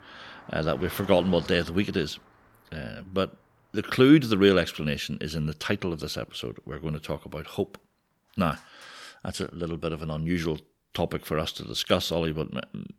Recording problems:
traffic noise; faint; throughout; 20 dB below the speech

